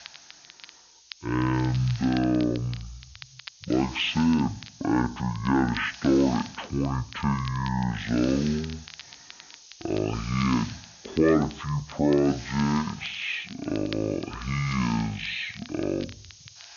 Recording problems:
wrong speed and pitch; too slow and too low; 0.5 times normal speed
high frequencies cut off; noticeable; nothing above 5.5 kHz
hiss; noticeable; throughout; 20 dB below the speech
crackle, like an old record; noticeable; 20 dB below the speech

